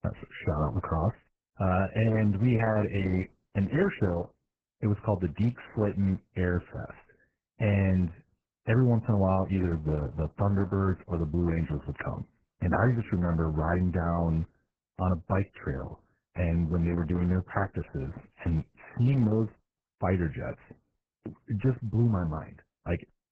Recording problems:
garbled, watery; badly

